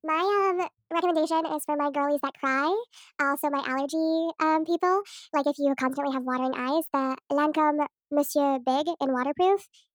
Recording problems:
wrong speed and pitch; too fast and too high; 1.5 times normal speed

